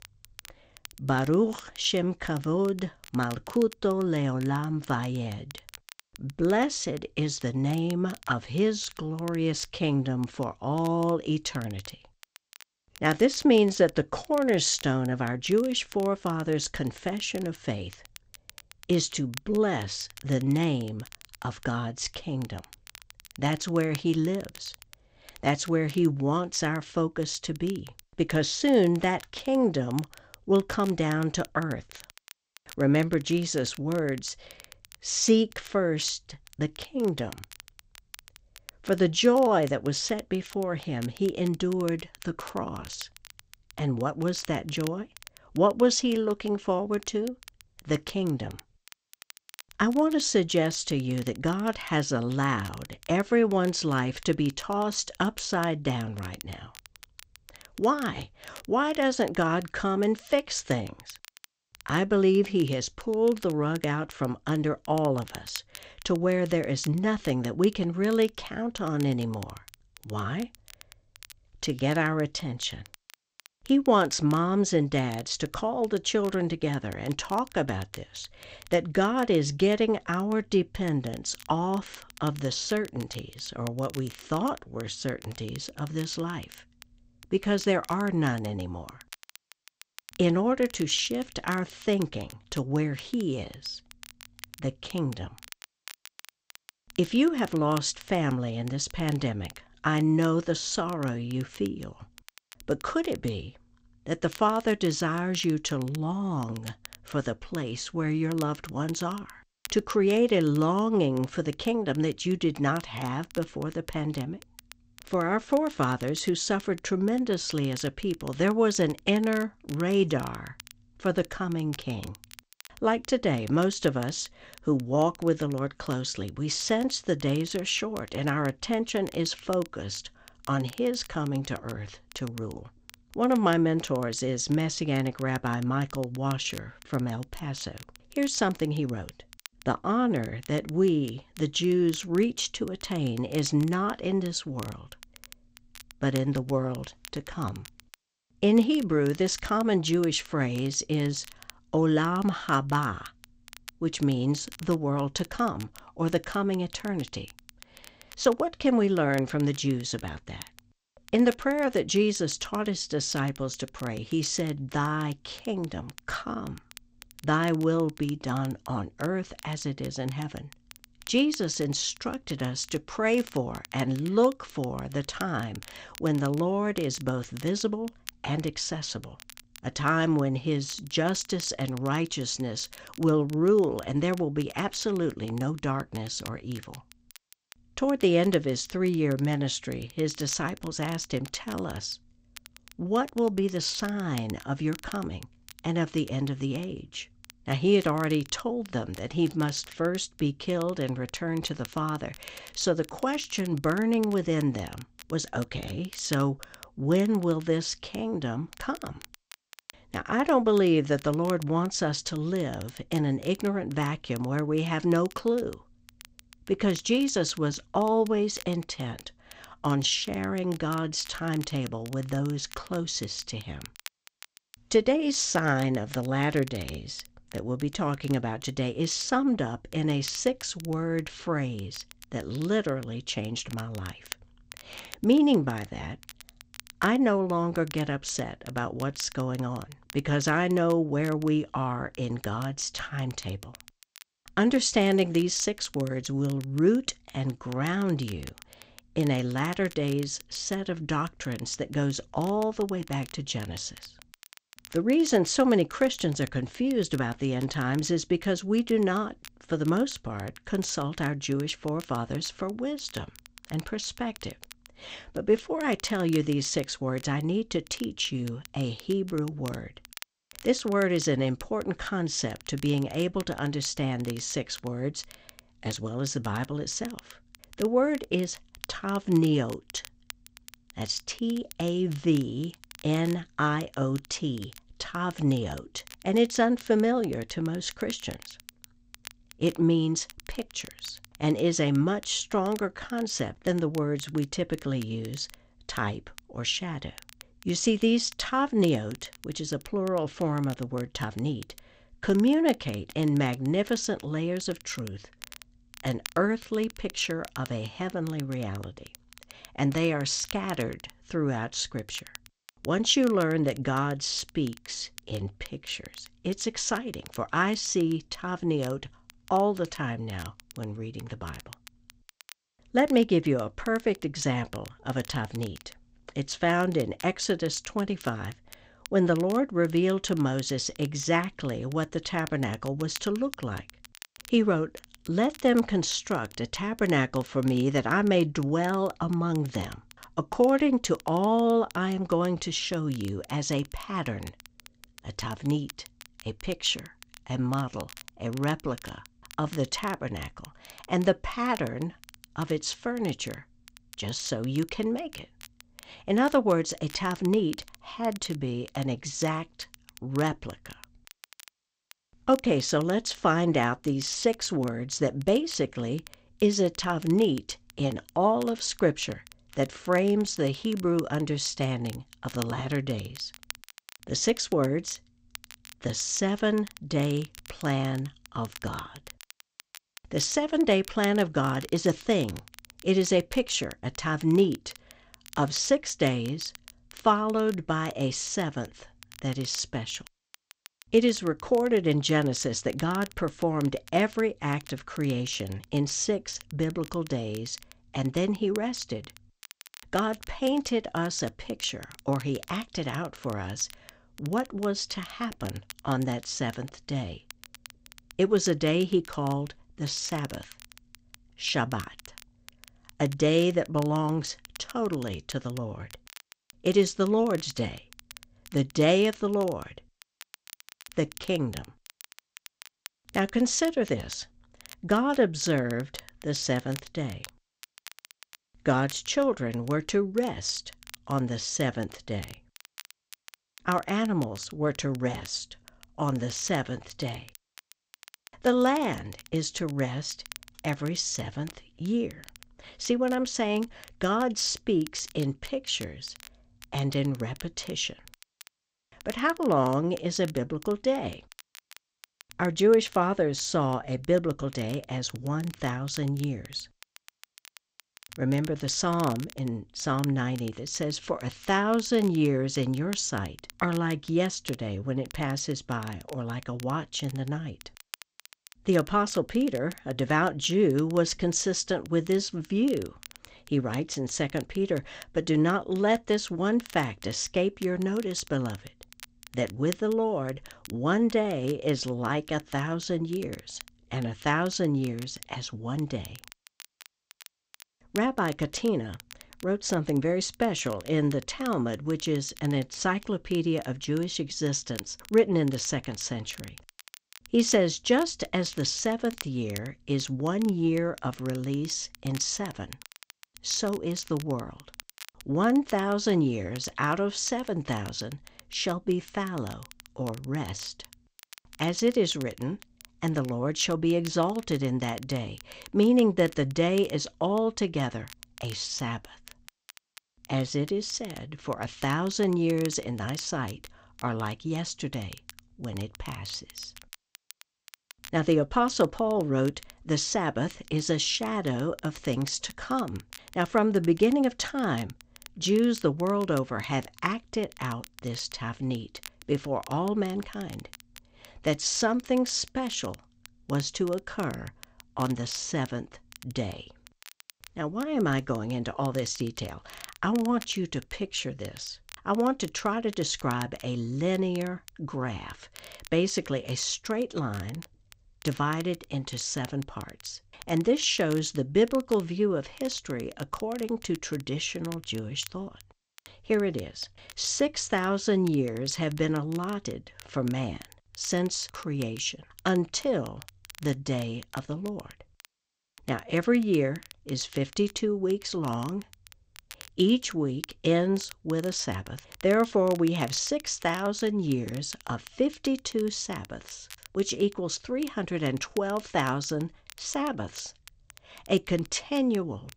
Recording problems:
garbled, watery; slightly; nothing above 7.5 kHz
crackle, like an old record; faint; 20 dB below the speech

